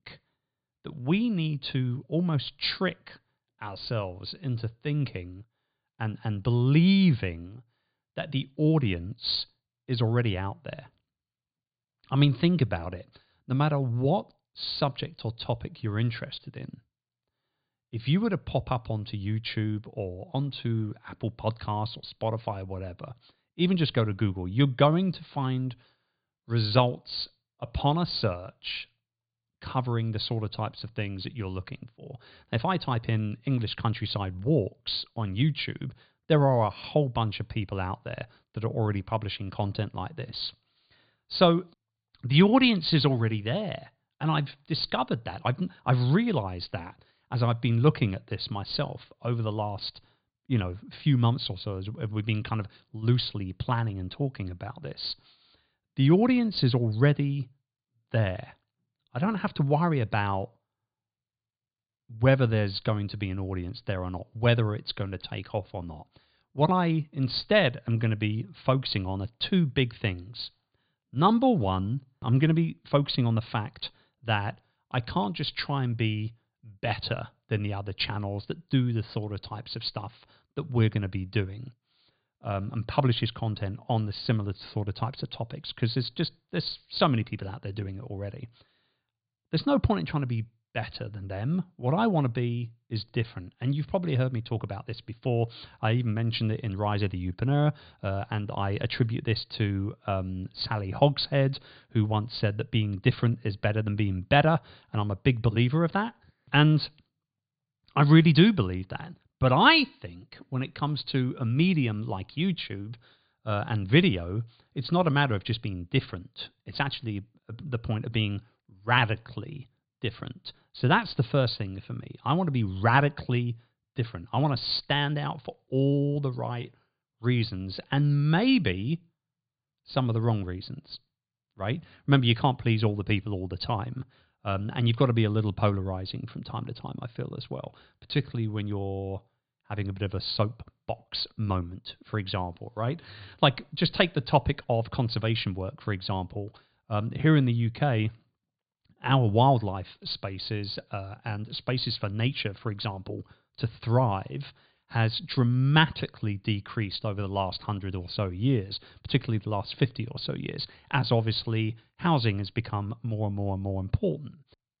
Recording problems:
high frequencies cut off; severe; nothing above 4.5 kHz

